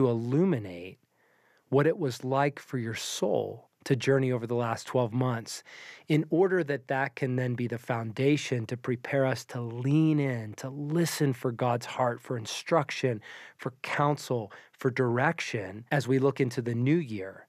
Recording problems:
abrupt cut into speech; at the start

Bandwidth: 14.5 kHz